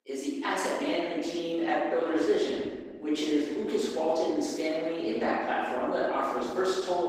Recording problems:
room echo; strong; dies away in 1.3 s
off-mic speech; far
garbled, watery; slightly; nothing above 15.5 kHz
thin; very slightly; fading below 250 Hz

